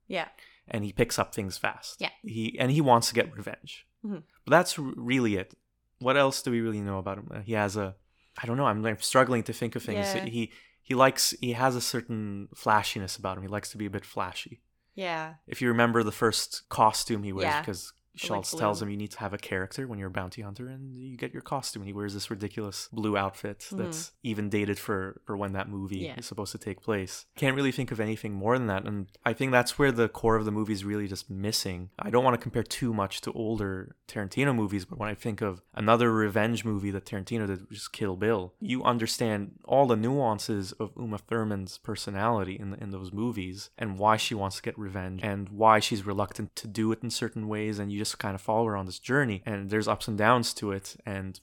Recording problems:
none

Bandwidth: 17.5 kHz